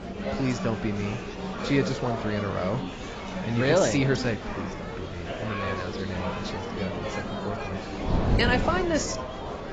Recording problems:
garbled, watery; badly; nothing above 7.5 kHz
chatter from many people; loud; throughout; 5 dB below the speech
wind noise on the microphone; occasional gusts; 15 dB below the speech

